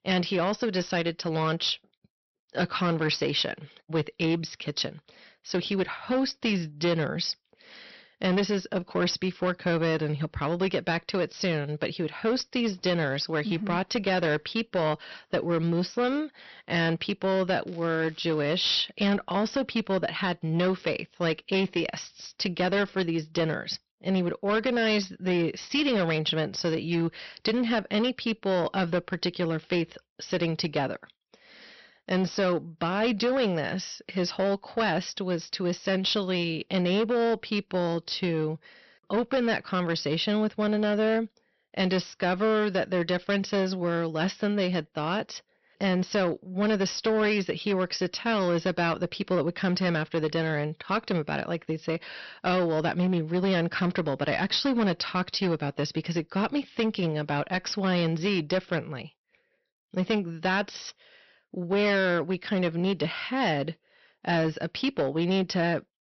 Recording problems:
high frequencies cut off; noticeable; nothing above 6 kHz
distortion; slight; 10% of the sound clipped
crackling; faint; at 18 s; 25 dB below the speech

